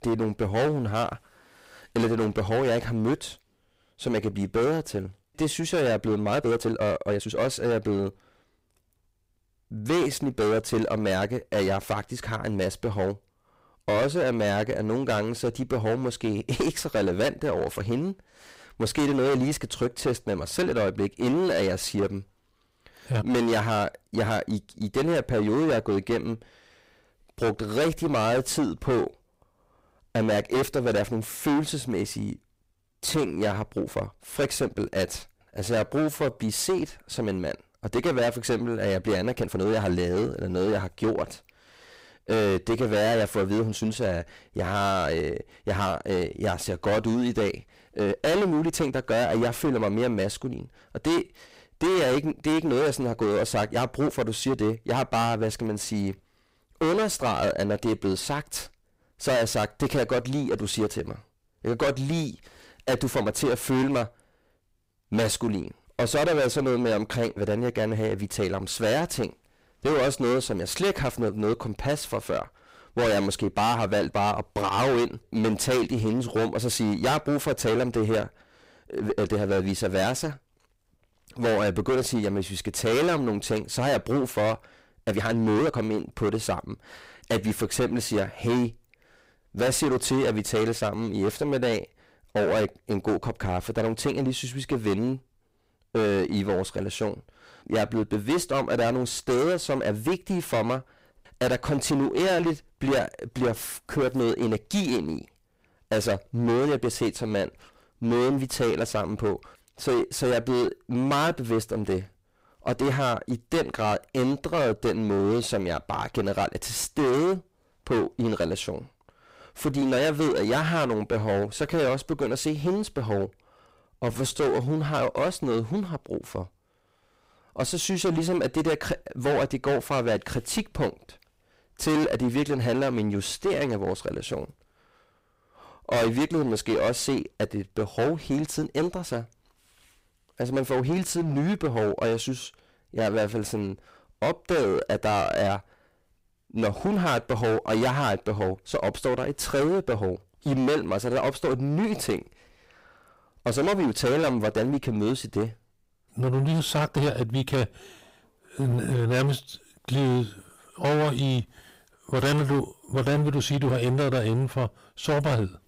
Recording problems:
distortion; heavy; 17% of the sound clipped
uneven, jittery; strongly; from 6.5 s to 2:37

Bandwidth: 15.5 kHz